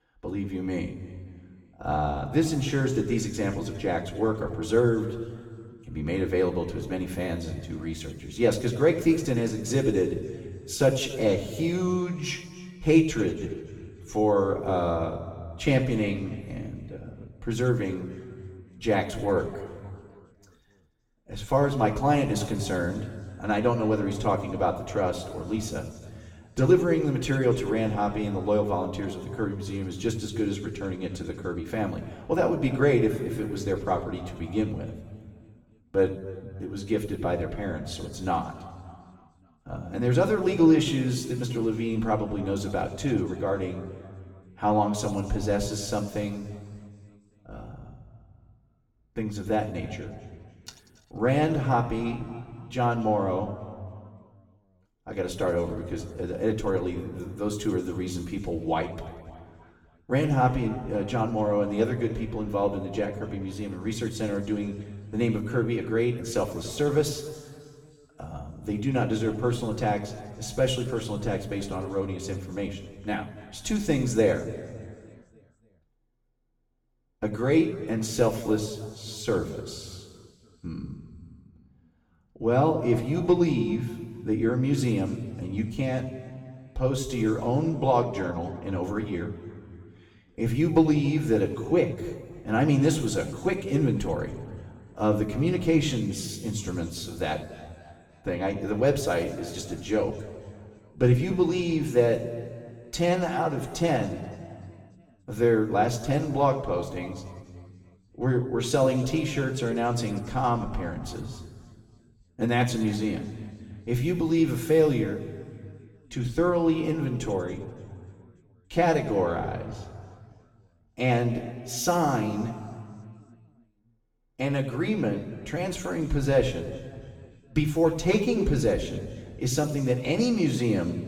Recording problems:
off-mic speech; far
room echo; slight; dies away in 1.8 s

